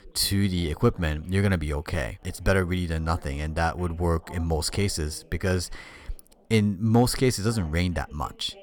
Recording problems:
voice in the background; faint; throughout; 25 dB below the speech

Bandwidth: 17.5 kHz